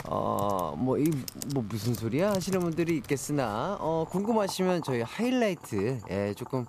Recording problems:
household noises; noticeable; throughout; 15 dB below the speech

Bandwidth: 14.5 kHz